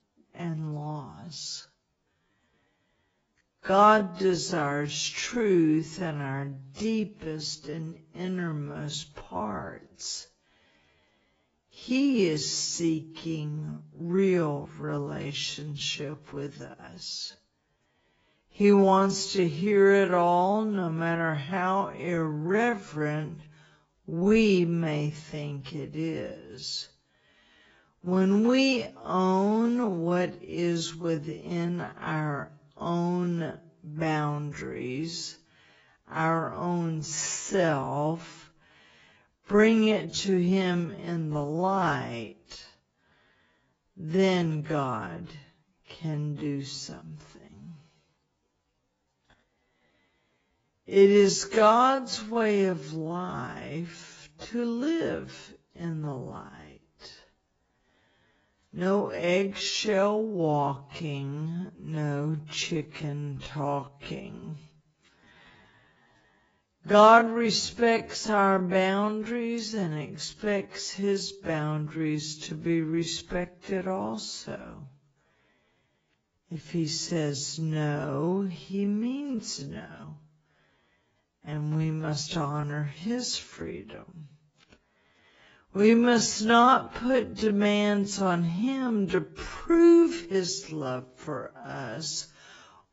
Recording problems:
garbled, watery; badly; nothing above 7.5 kHz
wrong speed, natural pitch; too slow; 0.5 times normal speed

